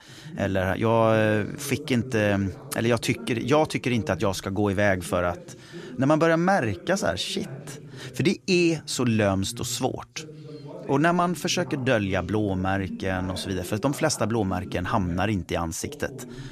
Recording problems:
voice in the background; noticeable; throughout; 15 dB below the speech

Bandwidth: 14.5 kHz